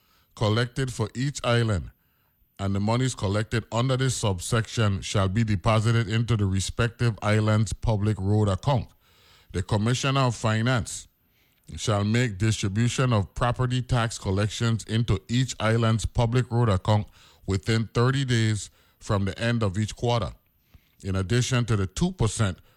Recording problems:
none

